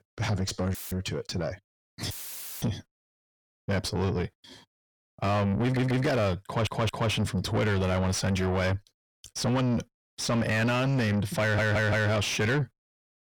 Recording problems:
distortion; heavy; 6 dB below the speech
audio cutting out; filled with static; at 0.5 s and at 2 s for 0.5 s
audio stuttering; at 5.5 s, at 6.5 s and at 11 s

